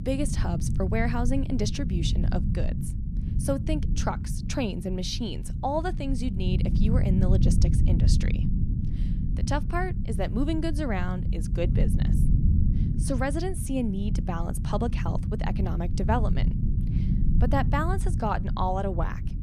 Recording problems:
low rumble; loud; throughout; 8 dB below the speech

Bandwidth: 14.5 kHz